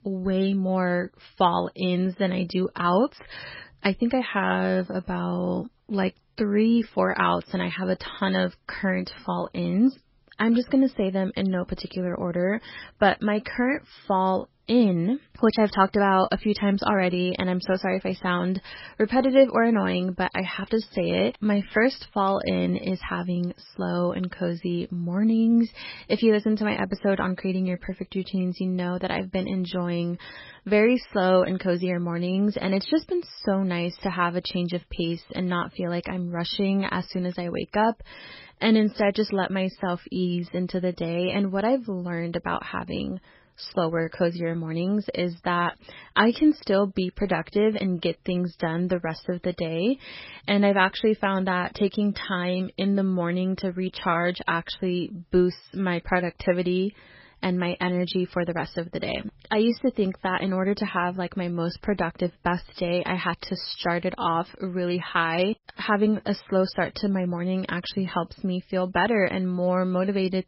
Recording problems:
garbled, watery; badly; nothing above 5.5 kHz

